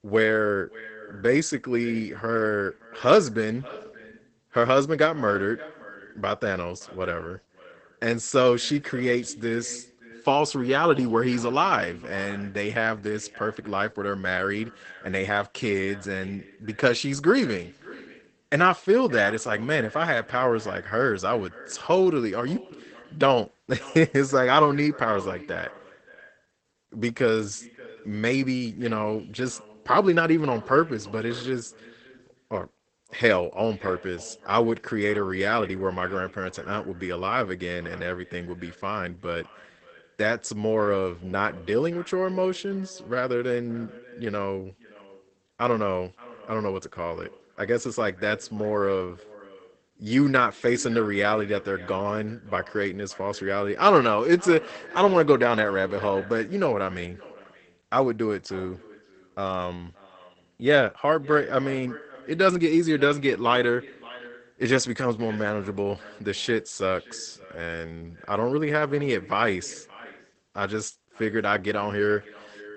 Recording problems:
garbled, watery; badly; nothing above 8 kHz
echo of what is said; faint; throughout; 570 ms later, 20 dB below the speech

